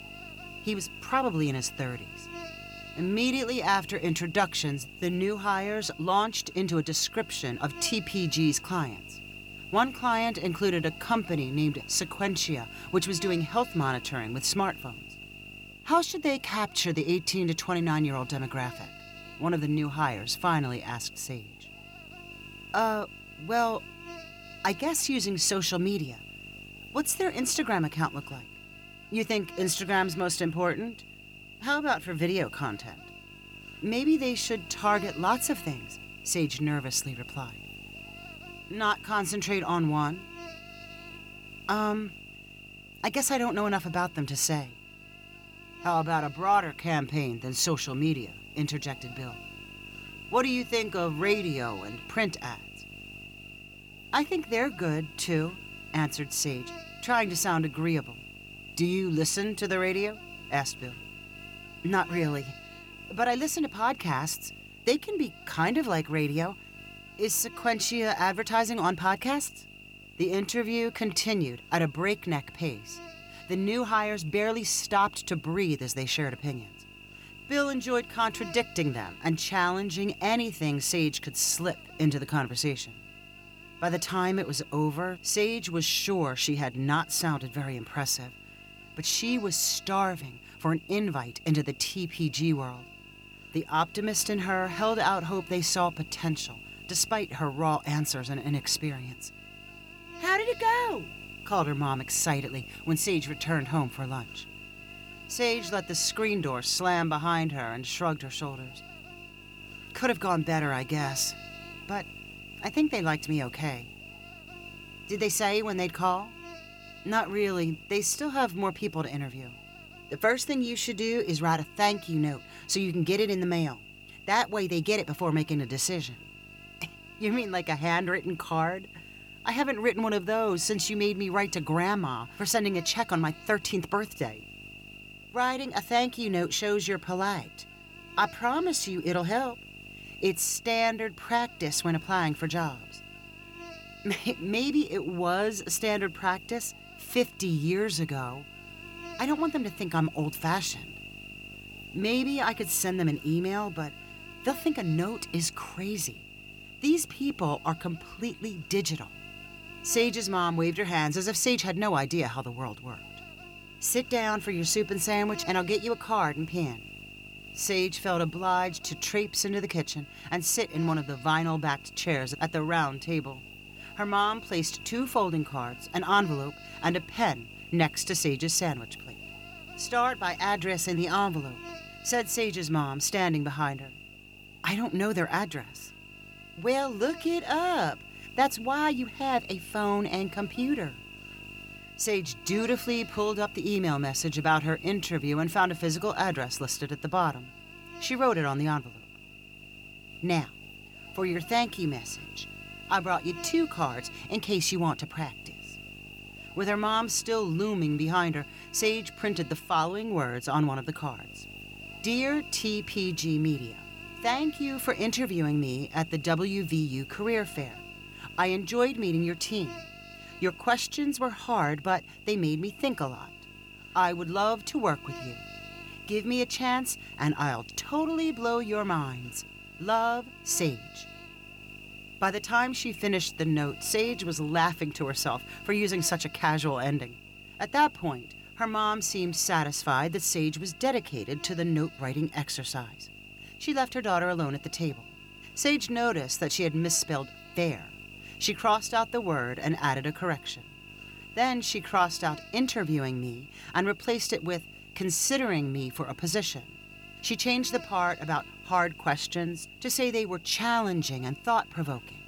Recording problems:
electrical hum; noticeable; throughout; 50 Hz, 15 dB below the speech

